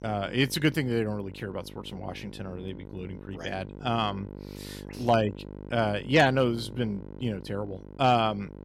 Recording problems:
electrical hum; faint; throughout; 50 Hz, 20 dB below the speech

